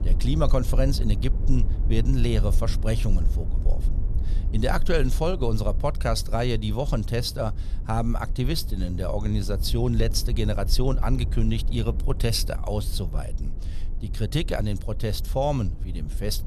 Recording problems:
low rumble; noticeable; throughout; 15 dB below the speech

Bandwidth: 13.5 kHz